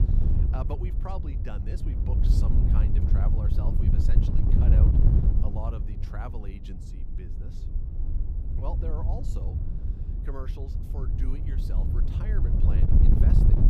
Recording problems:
wind noise on the microphone; heavy; 2 dB above the speech
electrical hum; noticeable; throughout; 60 Hz, 20 dB below the speech

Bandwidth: 15 kHz